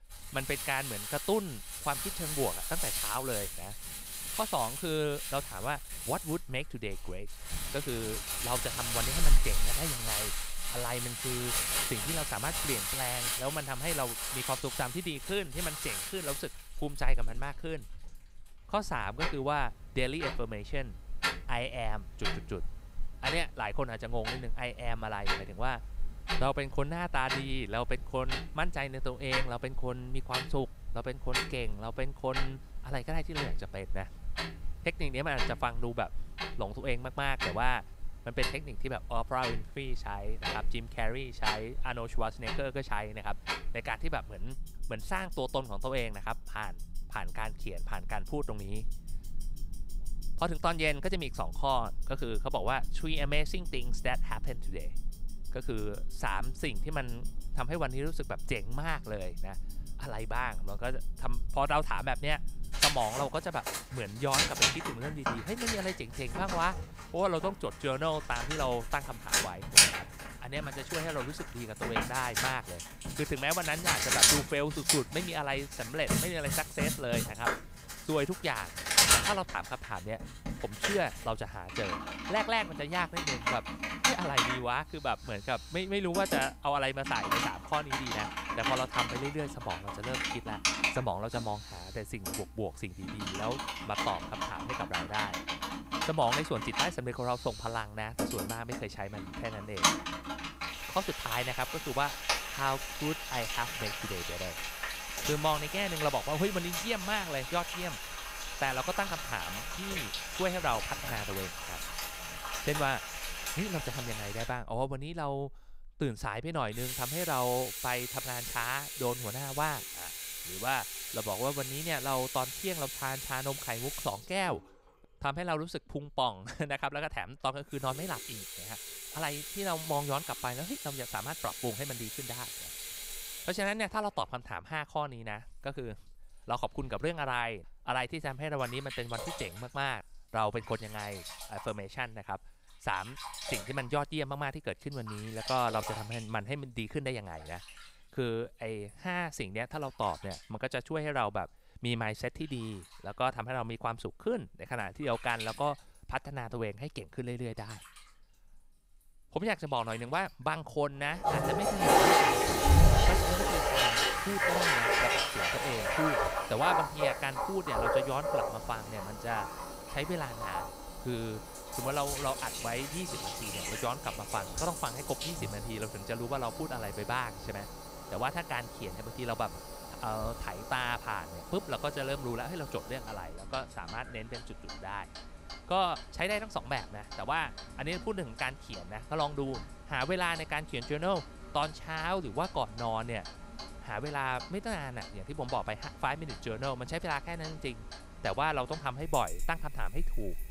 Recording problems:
household noises; very loud; throughout; 2 dB above the speech

